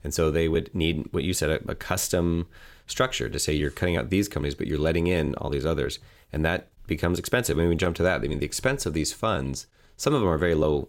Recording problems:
none

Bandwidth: 16.5 kHz